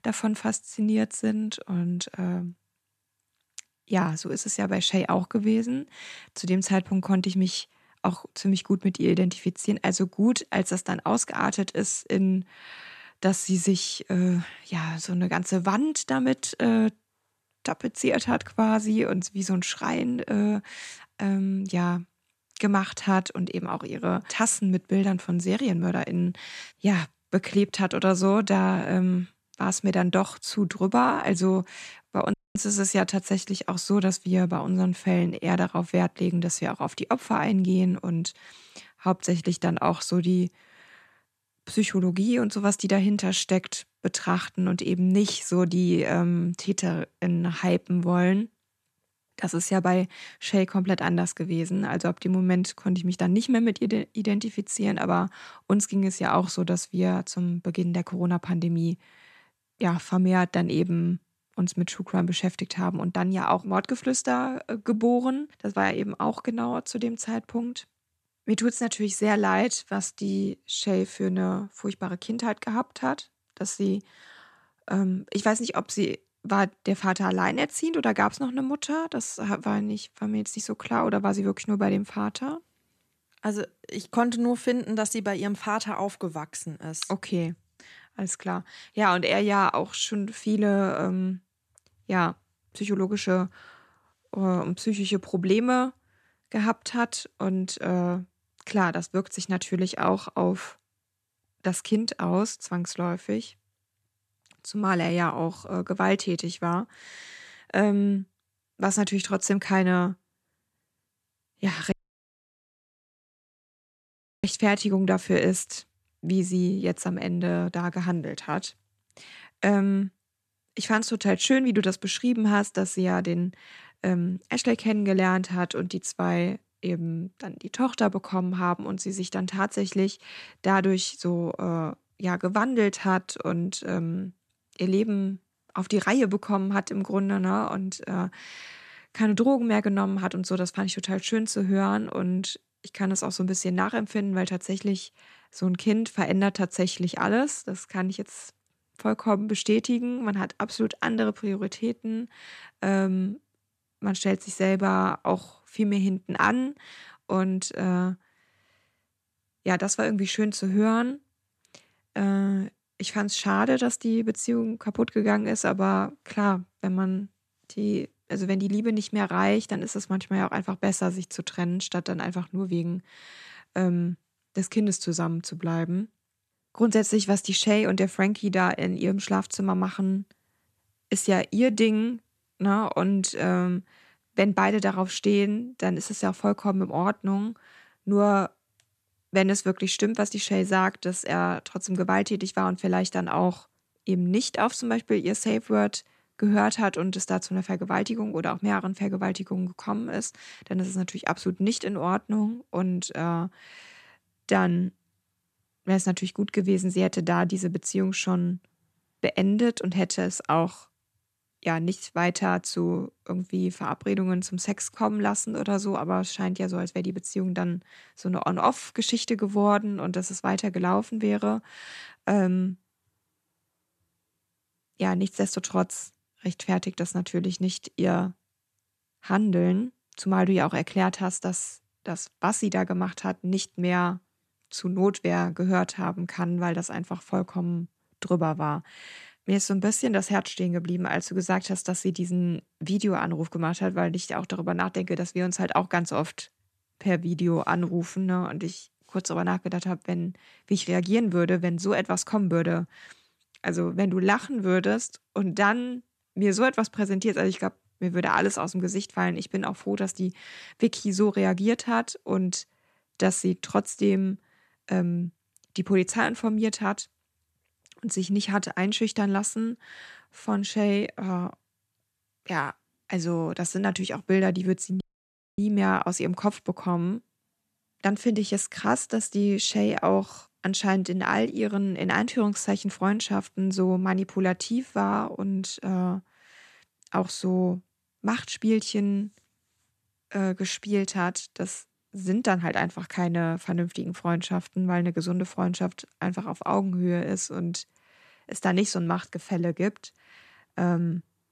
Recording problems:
audio cutting out; at 32 s, at 1:52 for 2.5 s and at 4:35 for 0.5 s

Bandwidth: 14 kHz